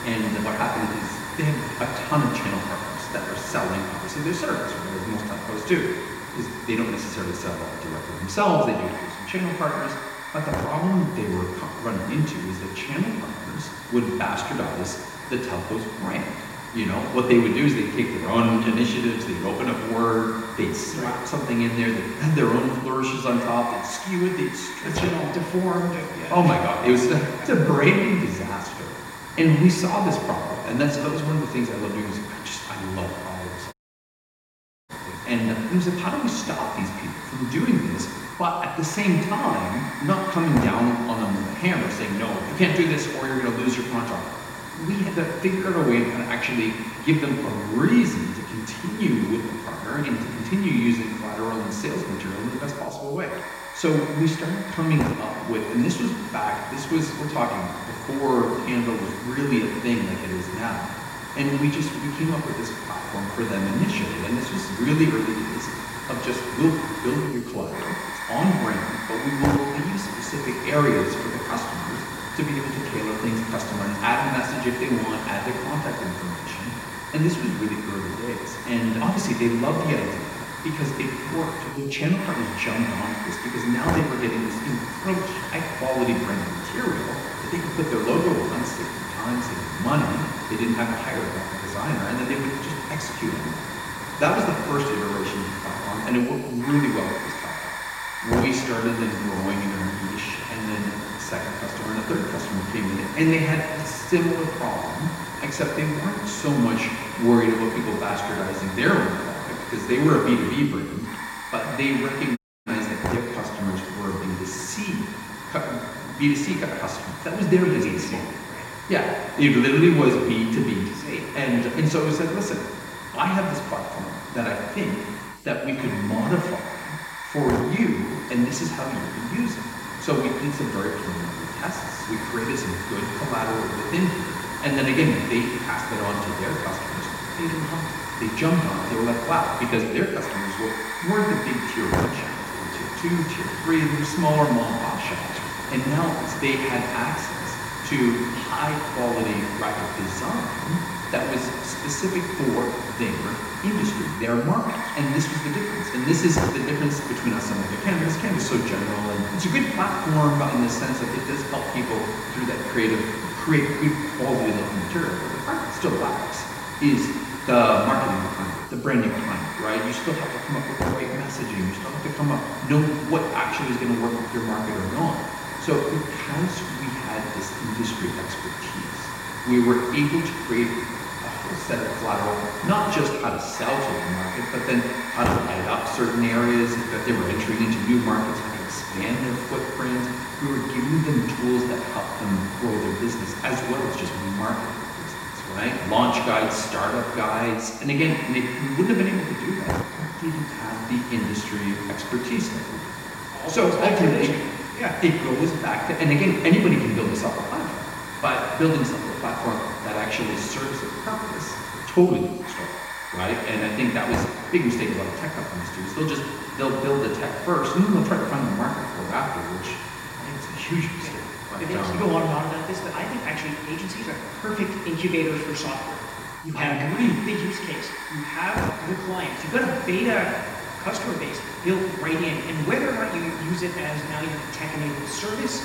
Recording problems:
room echo; noticeable; dies away in 1.5 s
off-mic speech; somewhat distant
hiss; loud; throughout; 7 dB below the speech
audio cutting out; at 34 s for 1 s and at 1:52

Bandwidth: 16 kHz